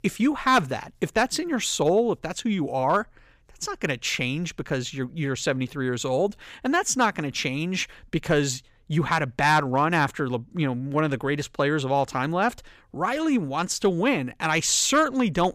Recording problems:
none

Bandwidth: 15 kHz